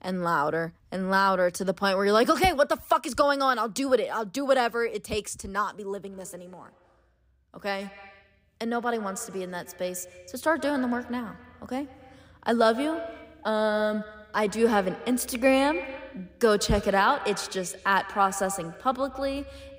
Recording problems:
echo of what is said; noticeable; from 6 s on; 130 ms later, 15 dB below the speech

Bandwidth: 15.5 kHz